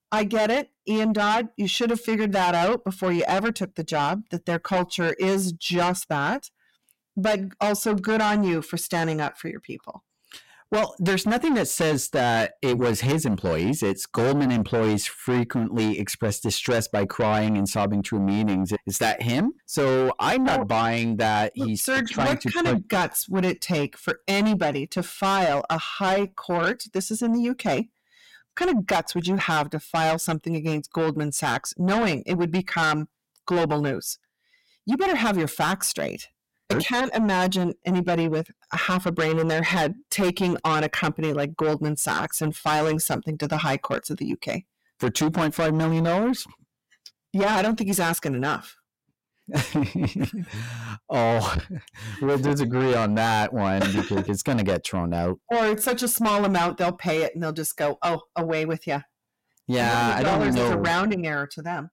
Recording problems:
distortion; heavy; 7 dB below the speech

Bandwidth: 16.5 kHz